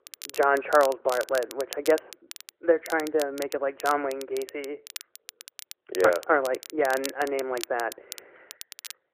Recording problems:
muffled; very; fading above 3.5 kHz
phone-call audio
crackle, like an old record; noticeable; 15 dB below the speech

